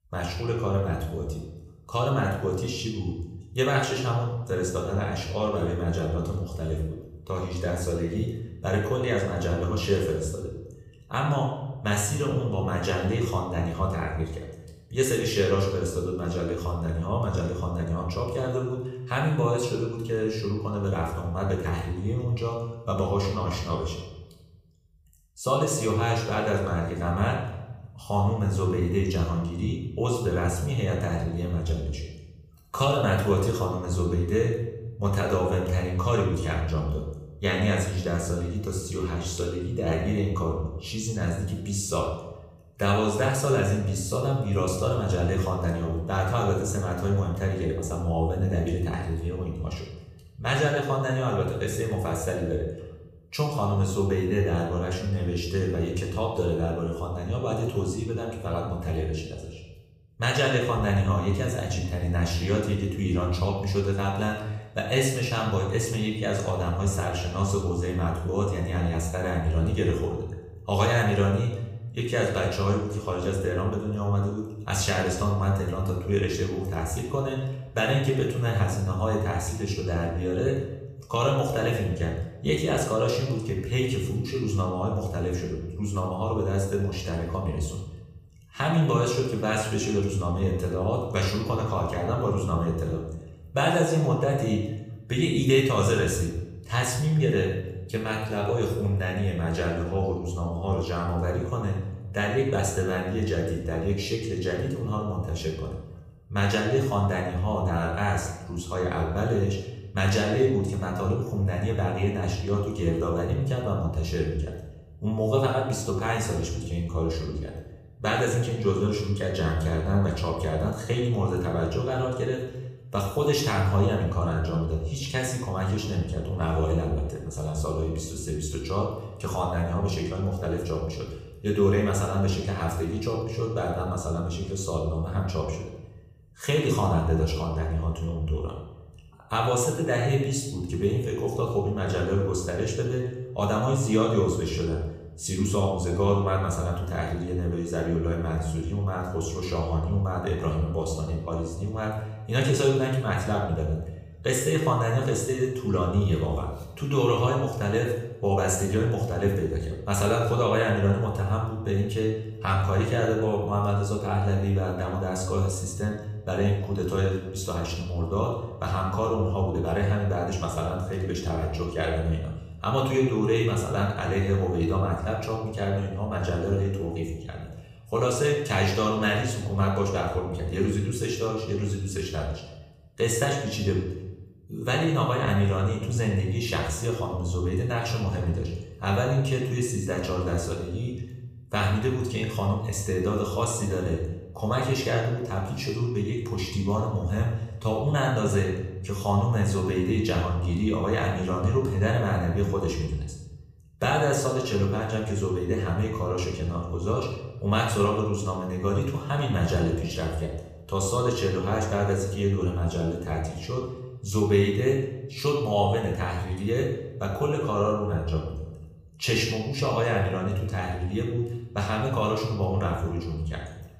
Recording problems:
room echo; noticeable; dies away in 0.8 s
off-mic speech; somewhat distant

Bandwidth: 15 kHz